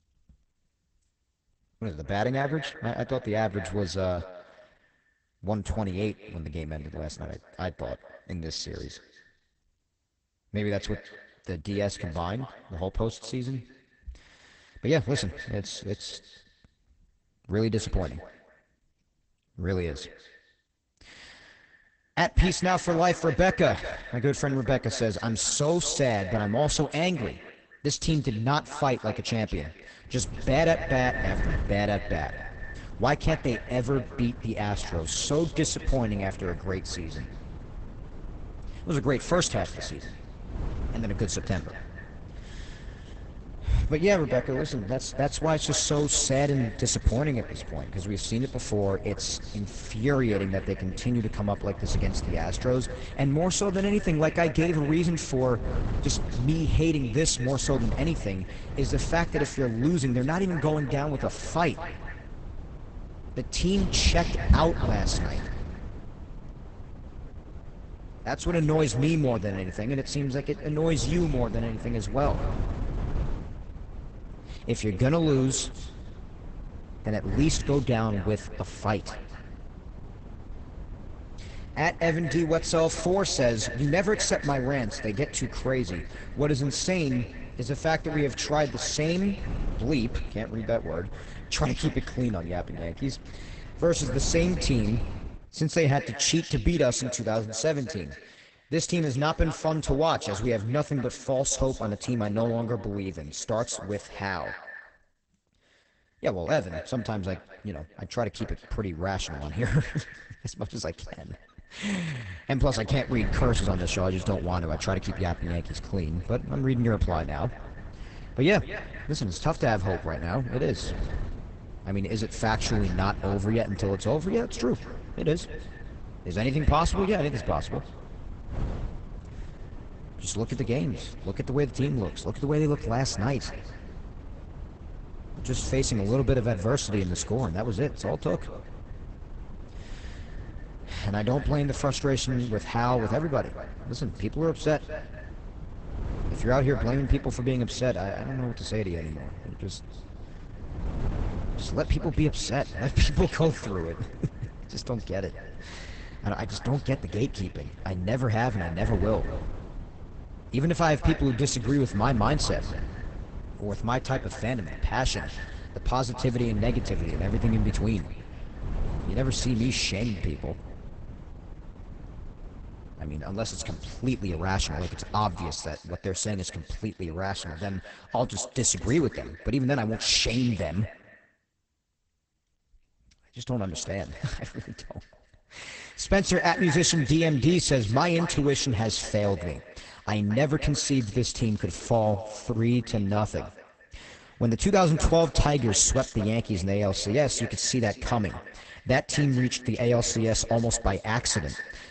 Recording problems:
garbled, watery; badly; nothing above 8 kHz
echo of what is said; noticeable; throughout; 220 ms later, 15 dB below the speech
wind noise on the microphone; occasional gusts; from 30 s to 1:35 and from 1:53 to 2:56; 20 dB below the speech

